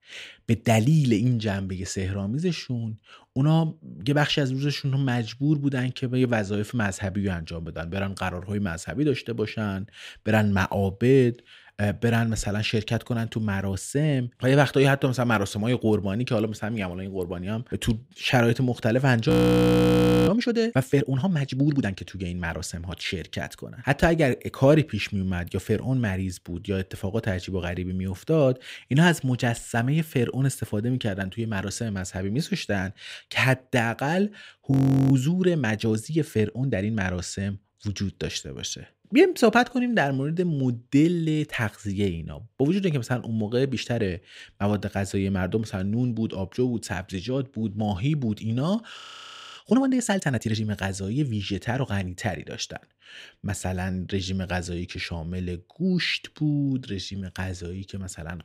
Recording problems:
audio freezing; at 19 s for 1 s, at 35 s and at 49 s for 0.5 s

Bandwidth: 15.5 kHz